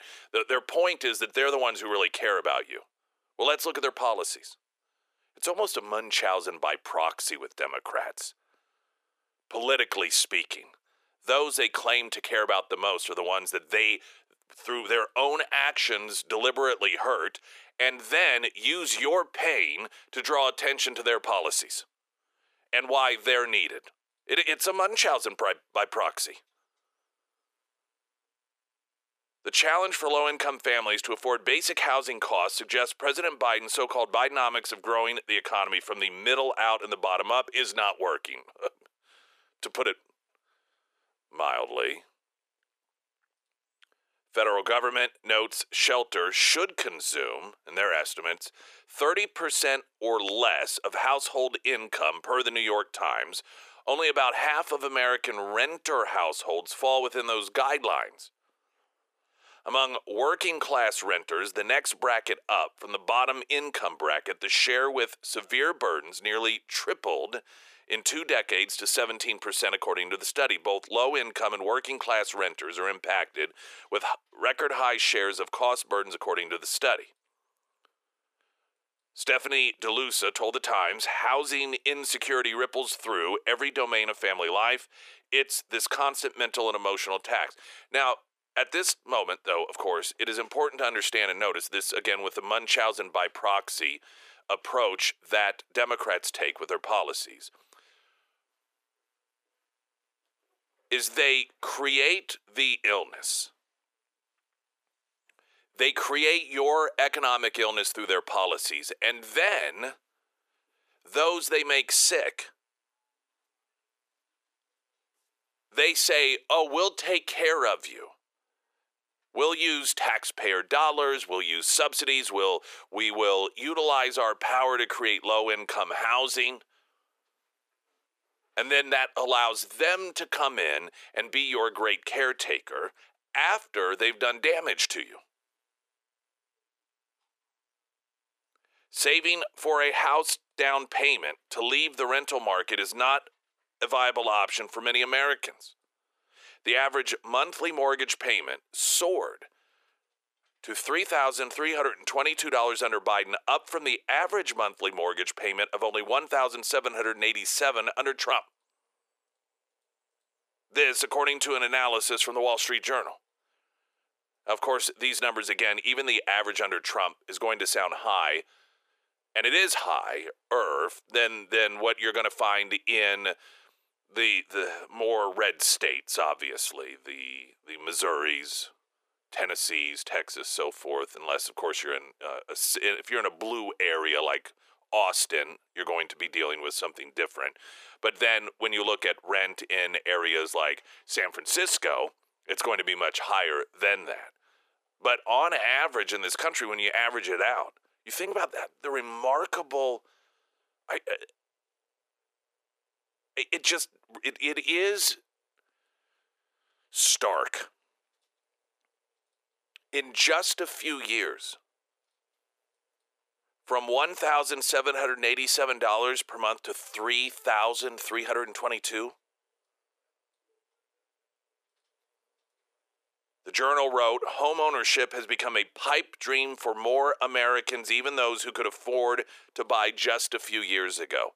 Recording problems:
thin; very; fading below 400 Hz

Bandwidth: 14.5 kHz